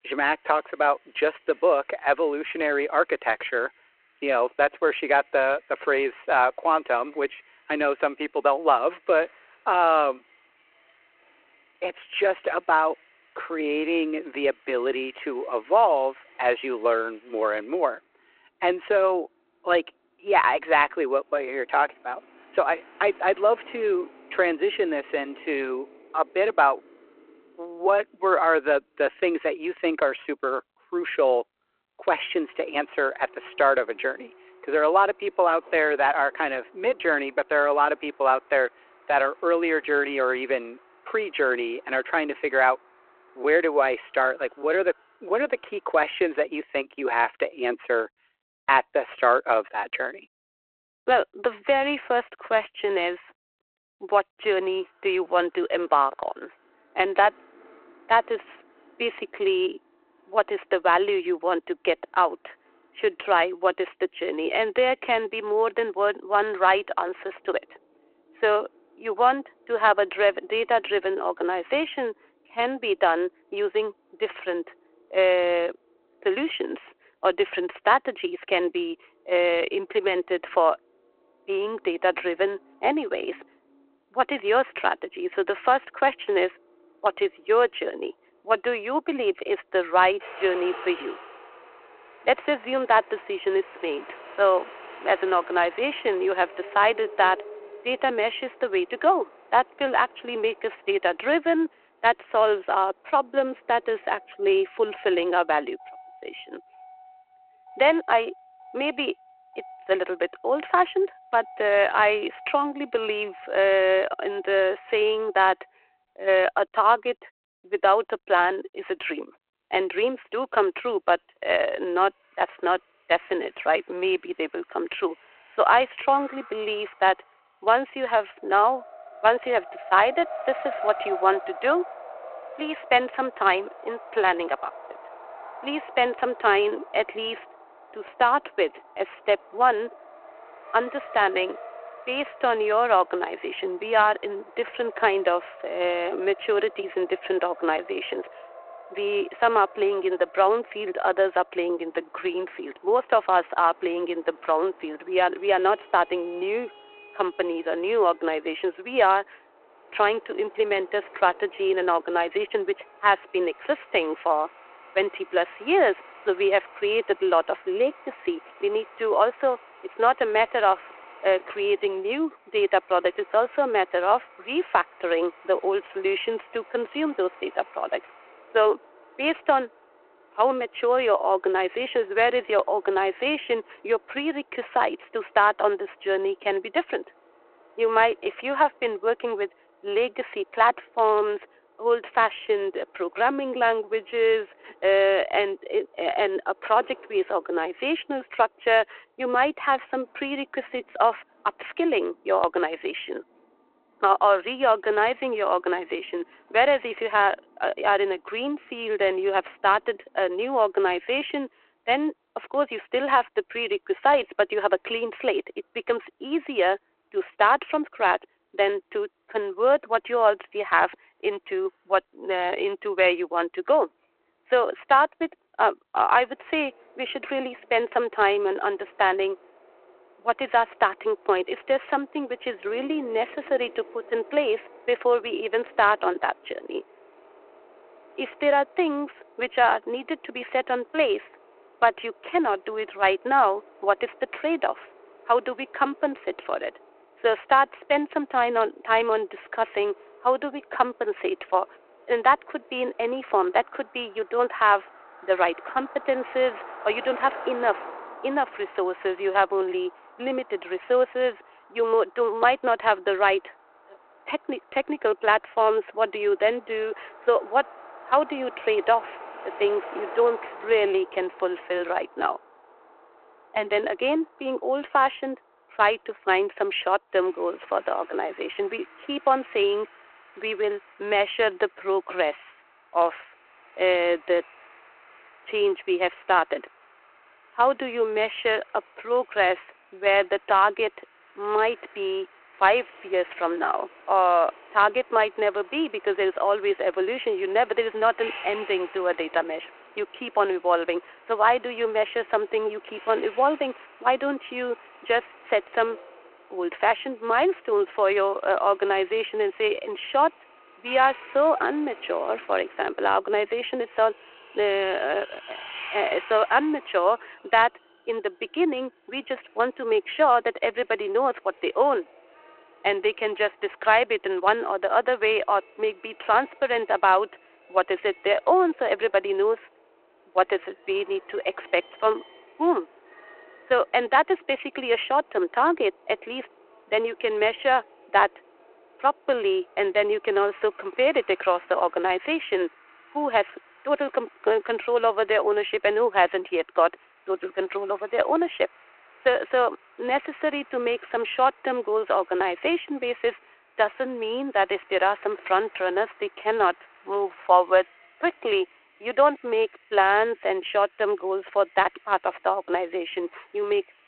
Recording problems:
phone-call audio
traffic noise; faint; throughout; 20 dB below the speech

